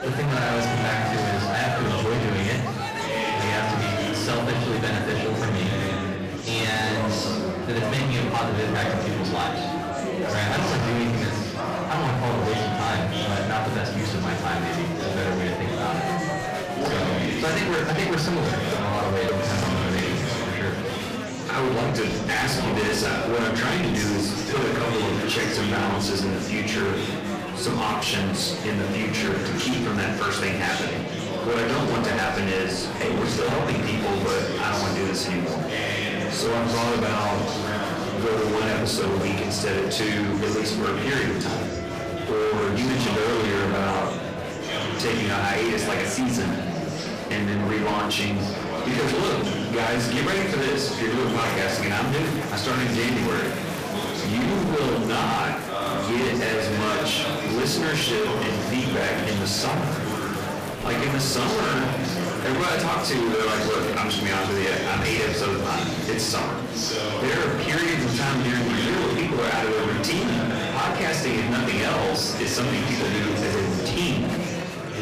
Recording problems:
distortion; heavy; 32% of the sound clipped
off-mic speech; far
room echo; slight; dies away in 0.6 s
murmuring crowd; loud; throughout; 4 dB below the speech
background music; noticeable; throughout; 15 dB below the speech
clattering dishes; noticeable; from 17 to 20 s; peak 7 dB below the speech

